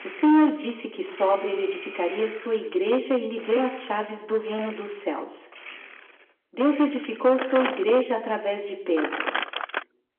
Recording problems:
room echo; slight; dies away in 0.7 s
phone-call audio
distortion; slight; 5% of the sound clipped
off-mic speech; somewhat distant
household noises; loud; throughout; 9 dB below the speech

